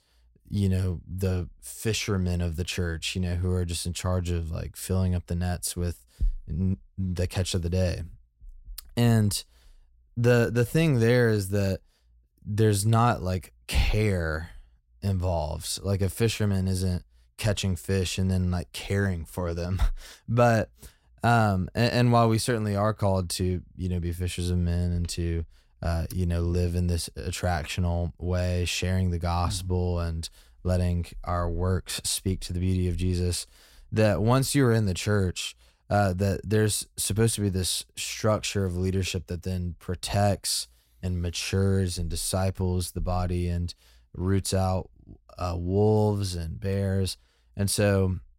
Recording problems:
none

